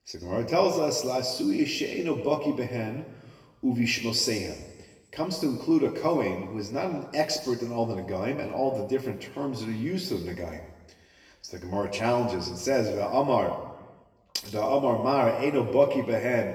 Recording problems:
off-mic speech; far
room echo; noticeable; dies away in 1.1 s

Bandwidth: 18.5 kHz